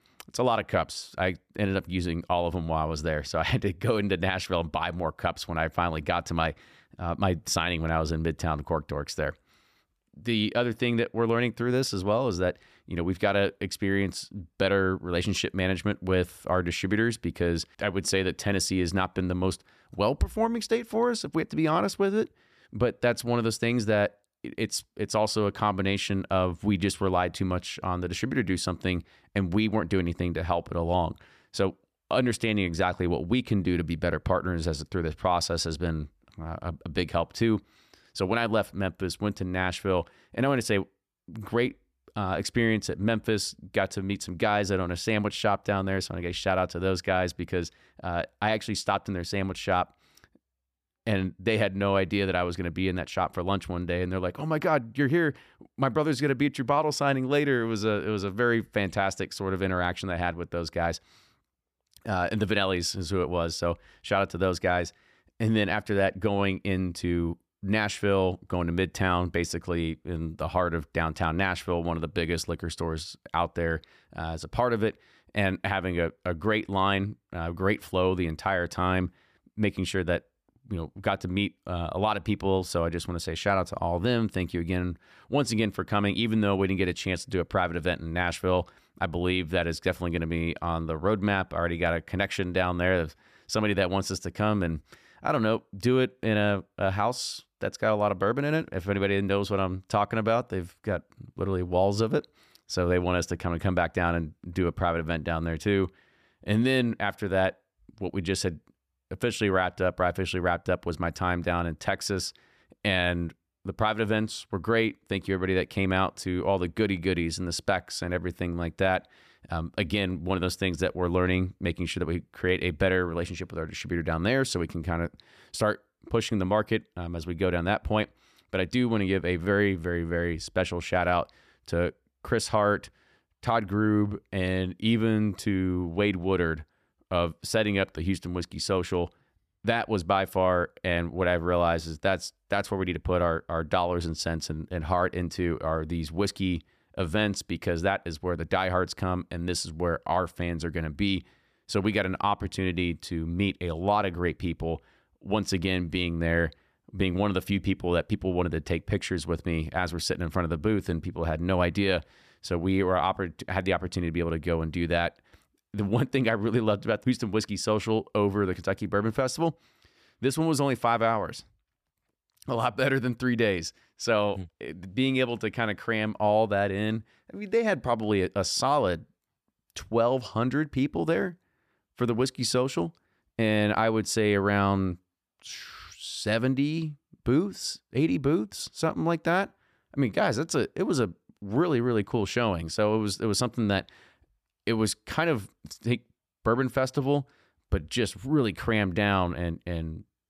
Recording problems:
none

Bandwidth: 14.5 kHz